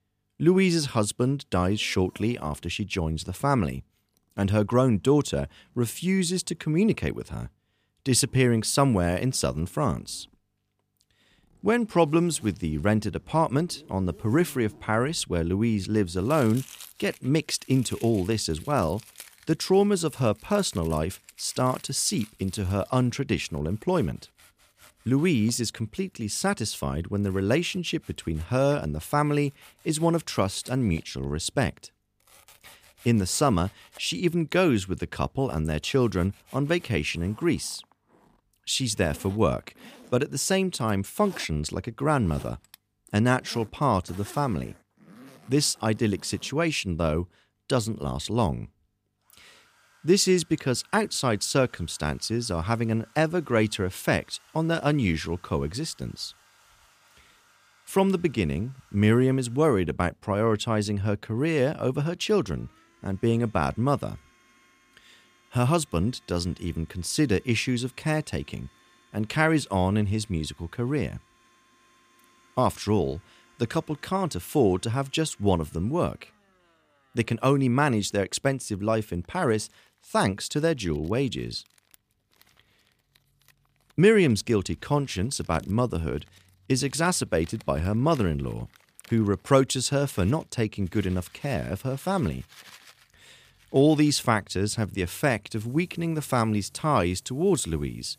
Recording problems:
household noises; faint; throughout; 25 dB below the speech

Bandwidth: 15 kHz